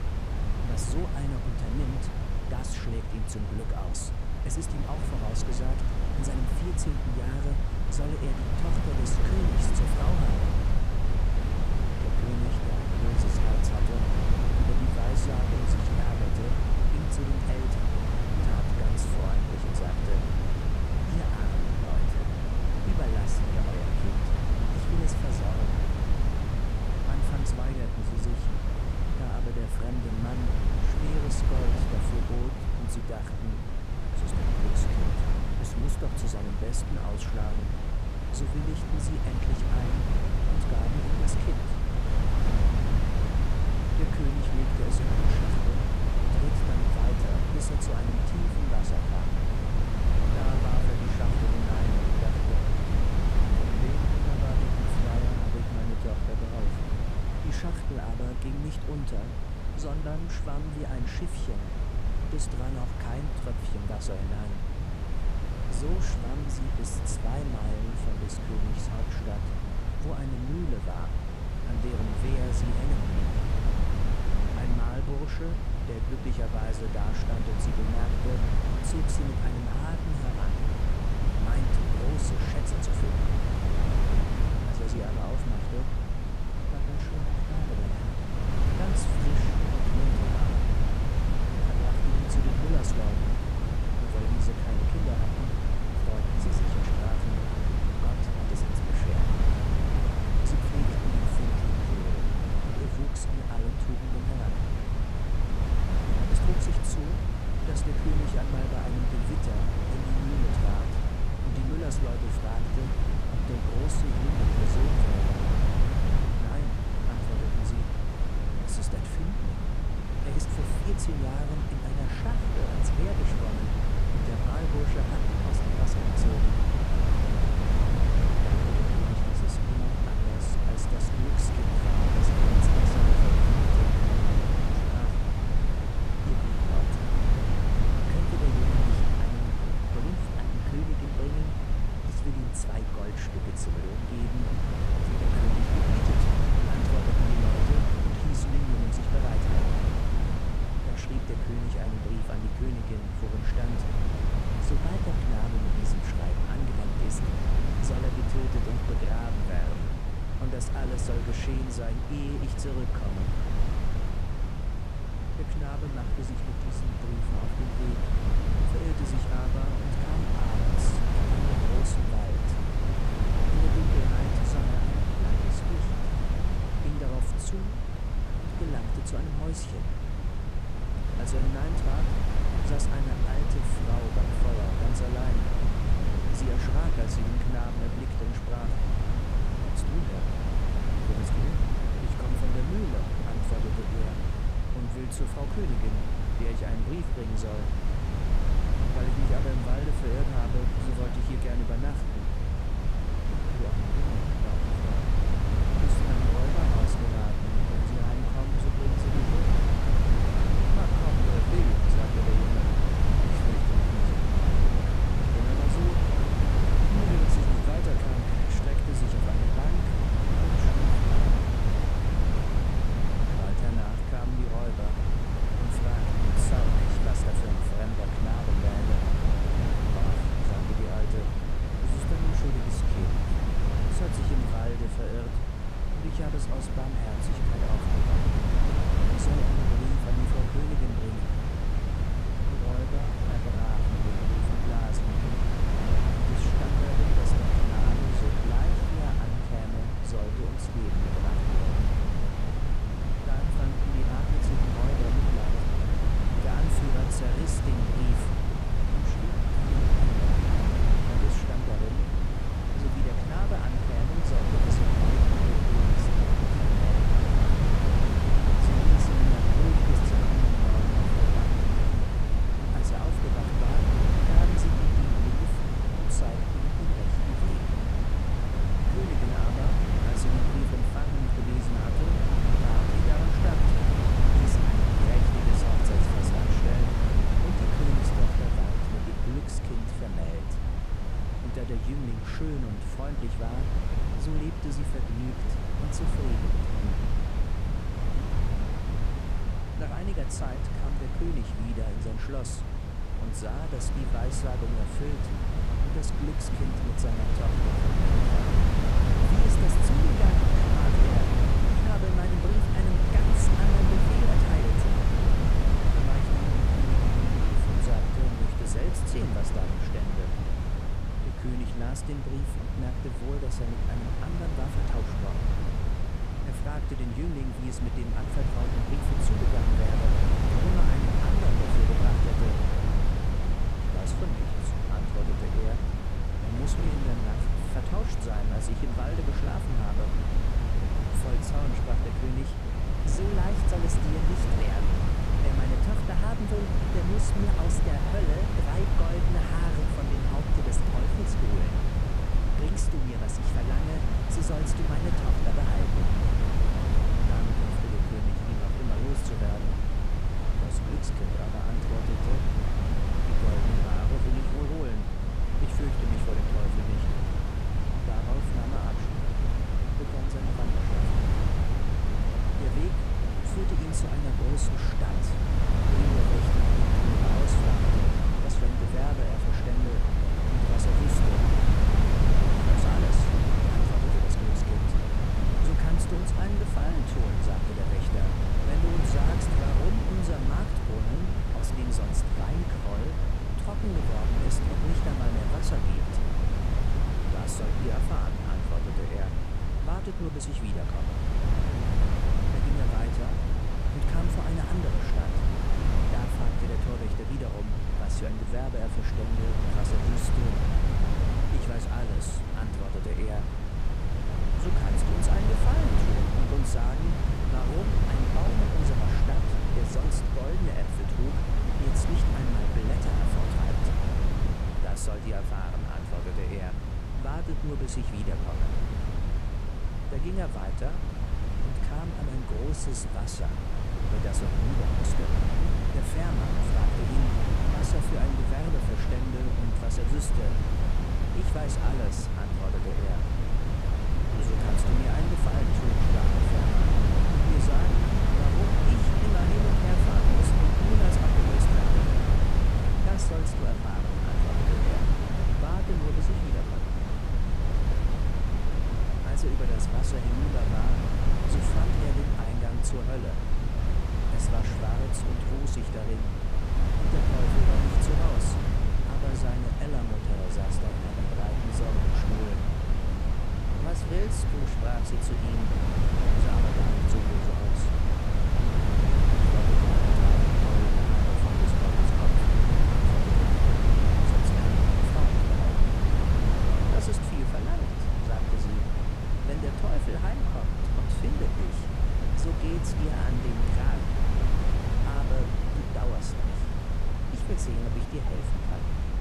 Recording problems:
wind noise on the microphone; heavy; 4 dB above the speech

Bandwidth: 14.5 kHz